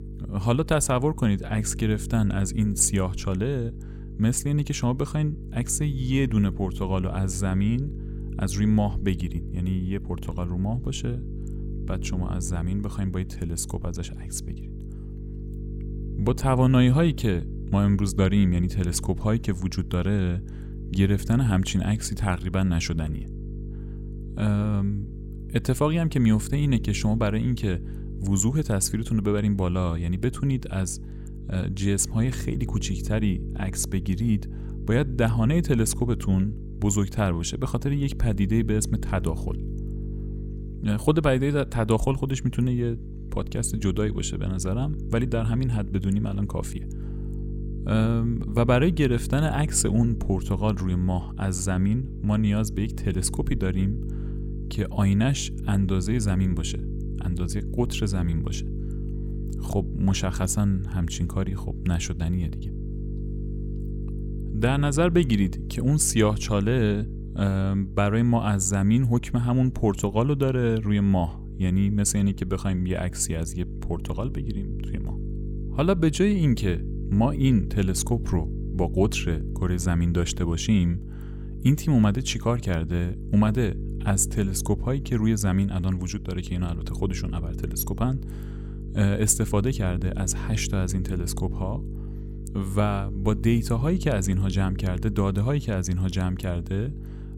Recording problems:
electrical hum; noticeable; throughout; 50 Hz, 15 dB below the speech

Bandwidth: 16 kHz